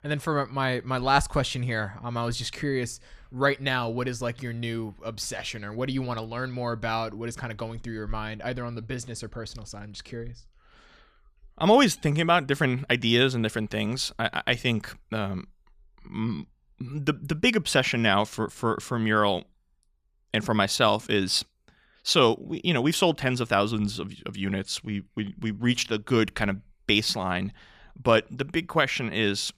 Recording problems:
none

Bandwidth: 14.5 kHz